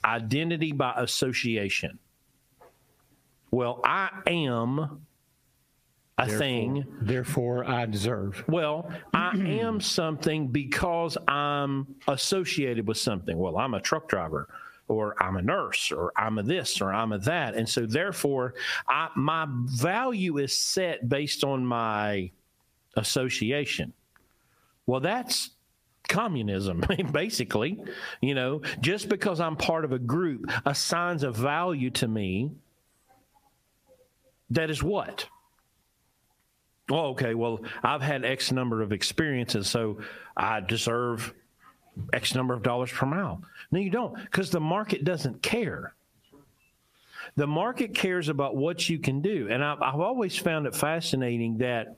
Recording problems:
squashed, flat; heavily

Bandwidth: 15 kHz